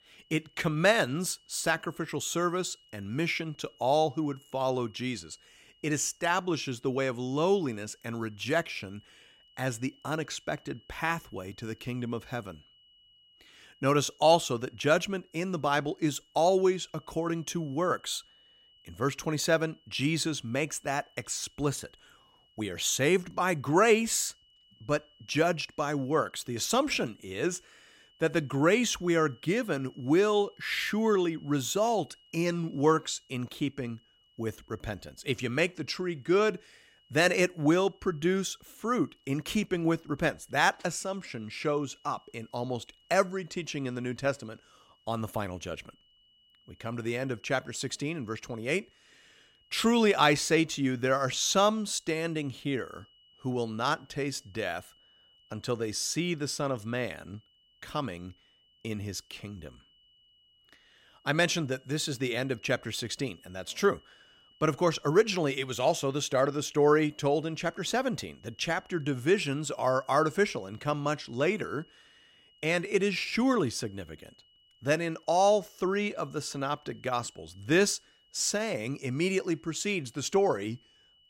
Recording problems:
high-pitched whine; faint; throughout; 3 kHz, 30 dB below the speech

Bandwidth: 16 kHz